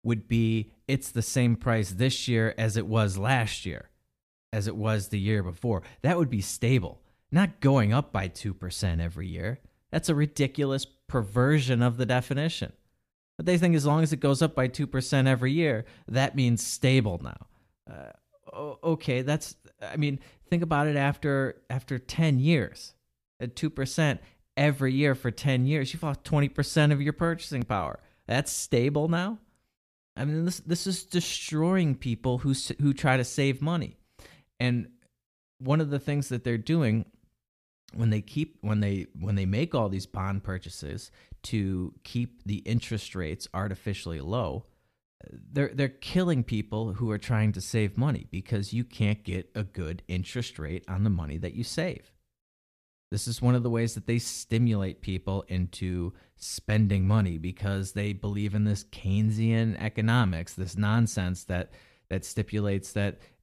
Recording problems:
none

